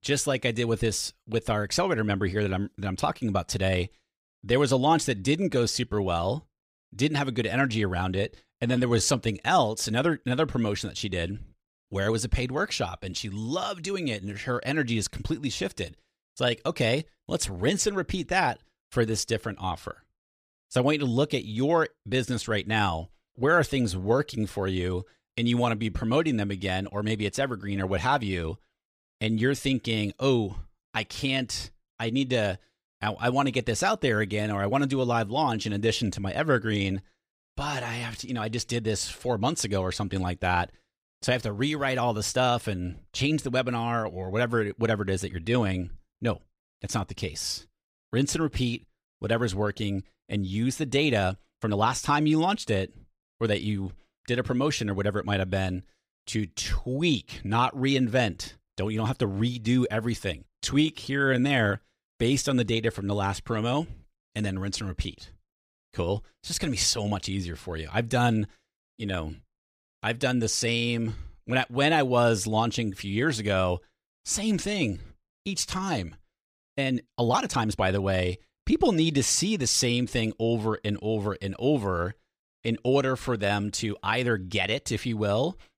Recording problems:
uneven, jittery; strongly; from 5 s to 1:18

